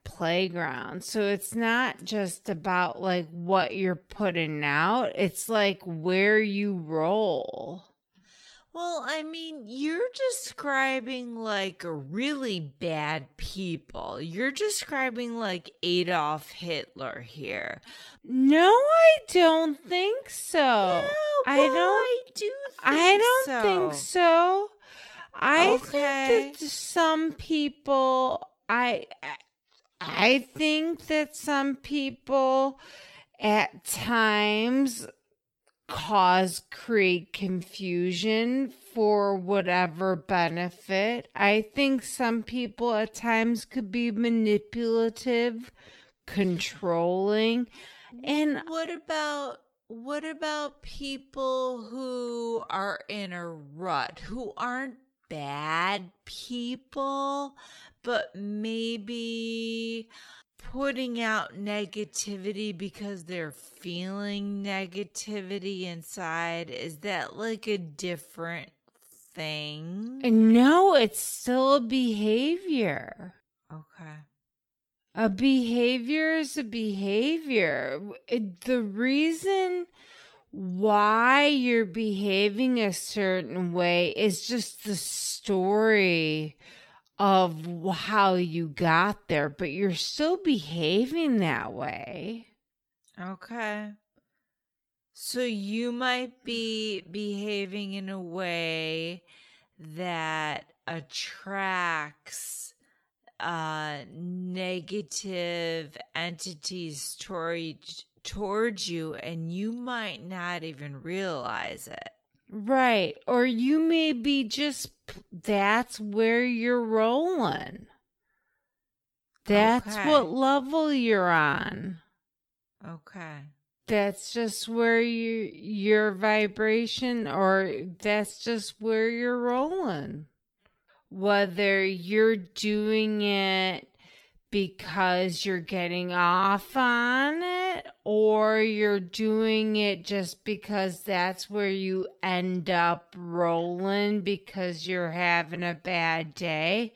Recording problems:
wrong speed, natural pitch; too slow; 0.5 times normal speed

